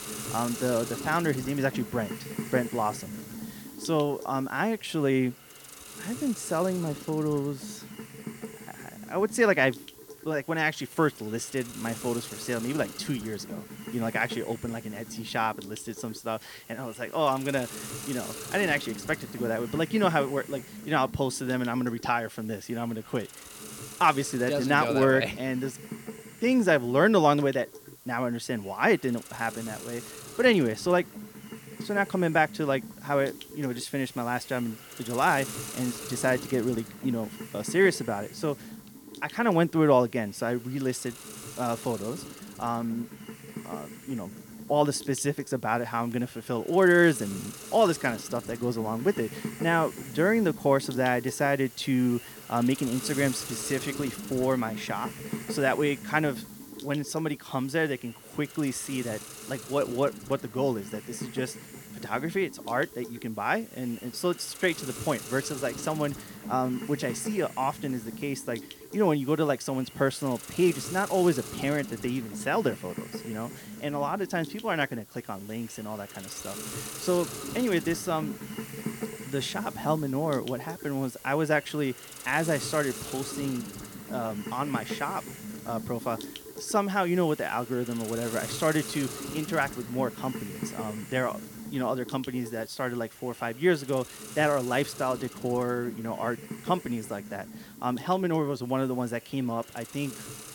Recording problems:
hiss; noticeable; throughout; 10 dB below the speech

